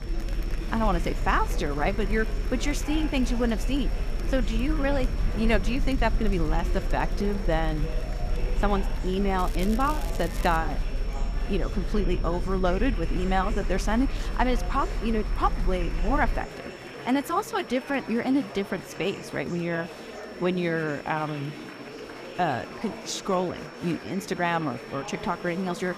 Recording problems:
murmuring crowd; noticeable; throughout; 10 dB below the speech
crackling; noticeable; from 9.5 to 11 s; 15 dB below the speech
high-pitched whine; faint; throughout; 5.5 kHz, 25 dB below the speech
low rumble; faint; until 16 s; 20 dB below the speech

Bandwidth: 14.5 kHz